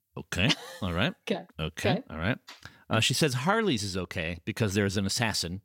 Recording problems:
none

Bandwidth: 16.5 kHz